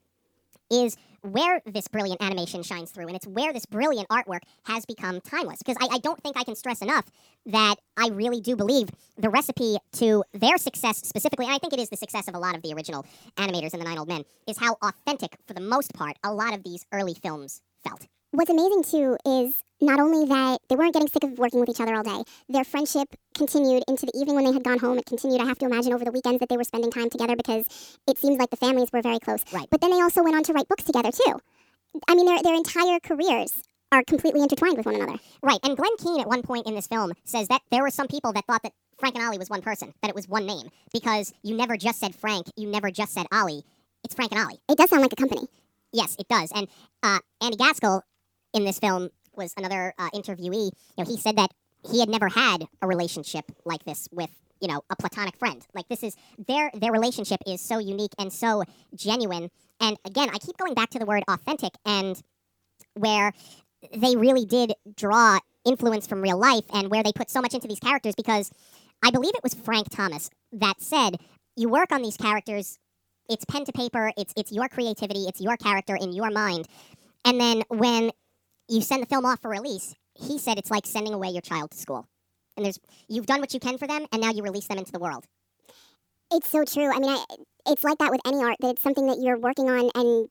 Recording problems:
wrong speed and pitch; too fast and too high; 1.5 times normal speed

